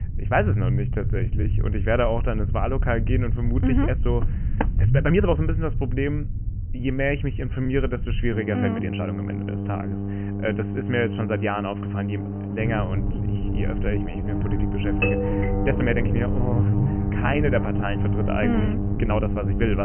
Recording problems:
high frequencies cut off; severe; nothing above 3 kHz
electrical hum; loud; from 8.5 s on; 50 Hz, 6 dB below the speech
low rumble; noticeable; until 8.5 s and from 13 s on; 15 dB below the speech
uneven, jittery; strongly; from 1 to 19 s
footsteps; noticeable; at 4 s; peak 4 dB below the speech
doorbell; loud; from 15 to 16 s; peak 2 dB above the speech
abrupt cut into speech; at the end

